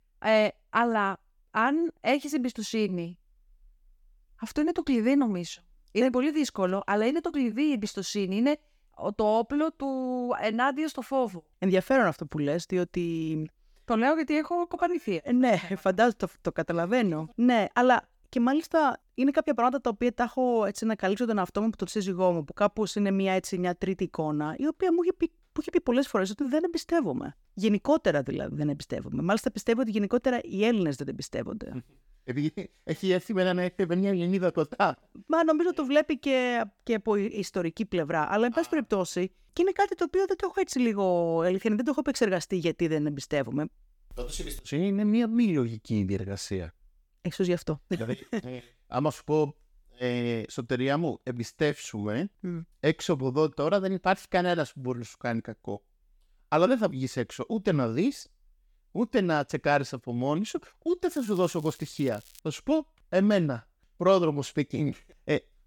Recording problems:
crackling; faint; from 1:01 to 1:02; 25 dB below the speech

